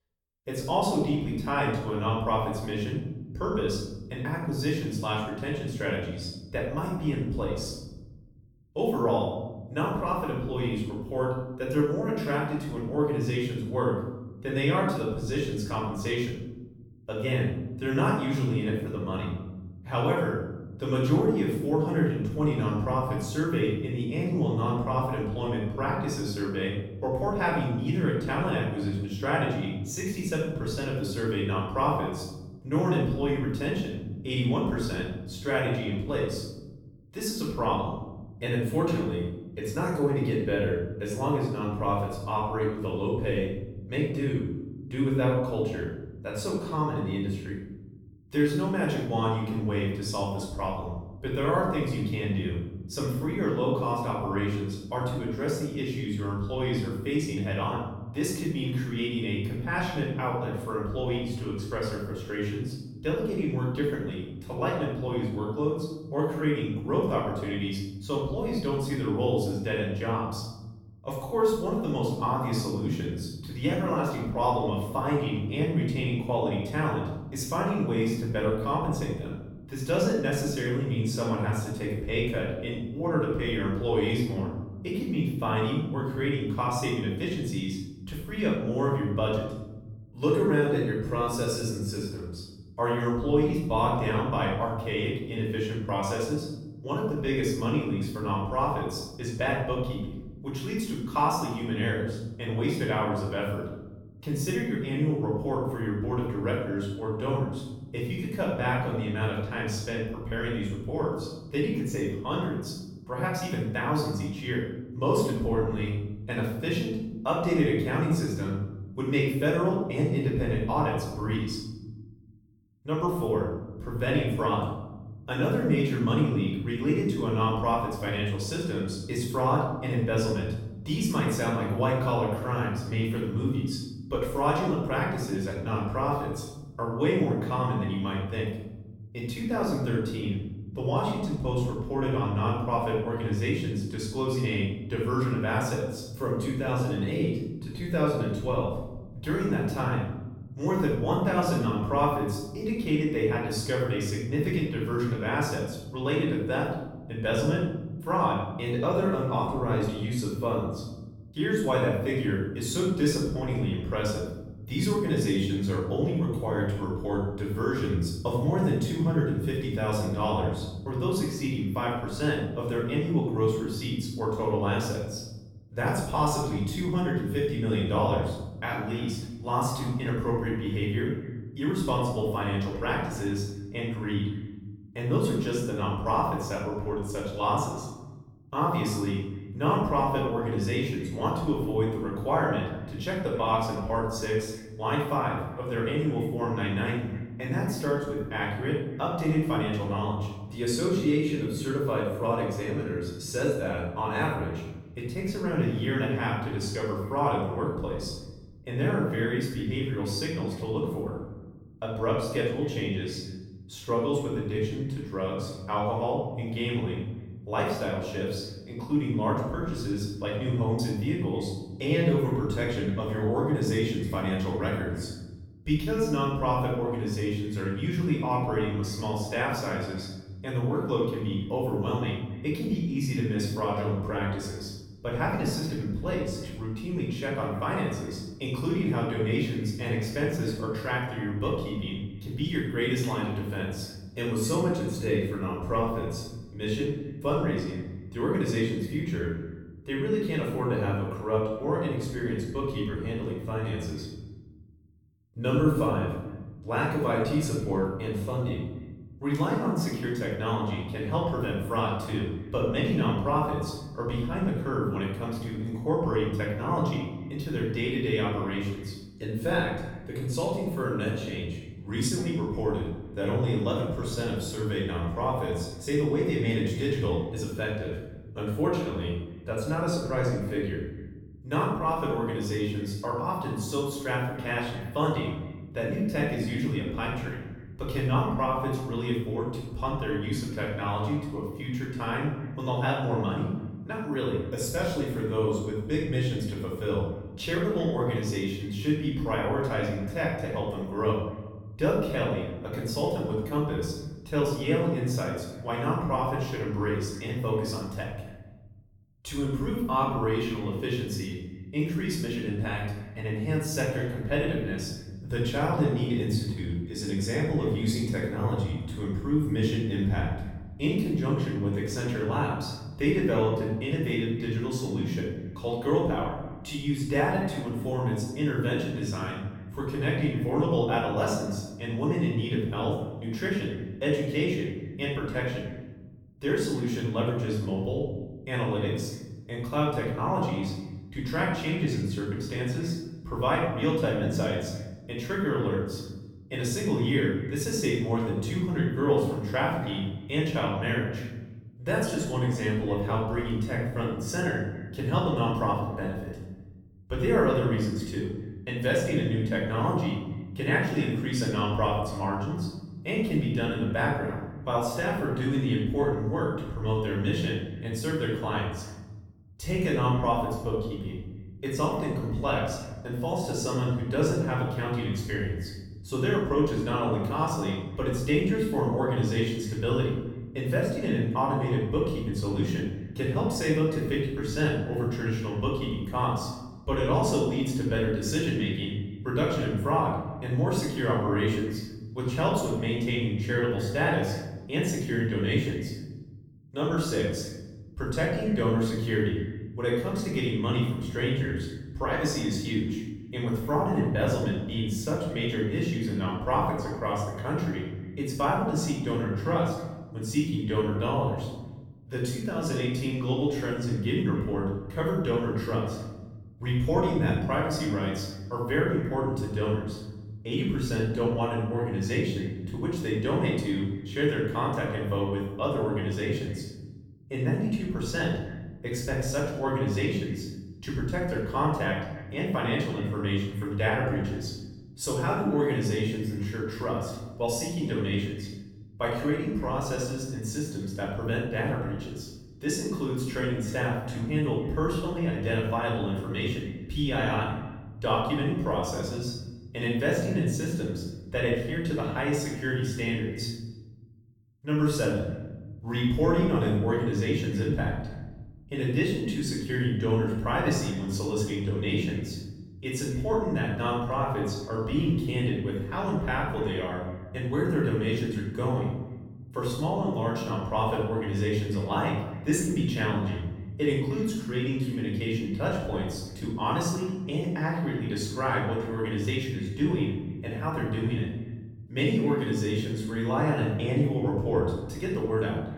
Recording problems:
off-mic speech; far
room echo; noticeable; dies away in 1.3 s
echo of what is said; faint; from 2:59 on; 260 ms later, 25 dB below the speech

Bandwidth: 17 kHz